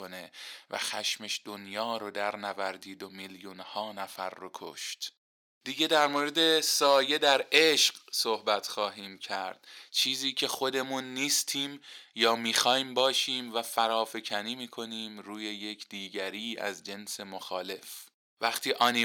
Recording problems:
thin; somewhat; fading below 450 Hz
abrupt cut into speech; at the start and the end

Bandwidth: 18 kHz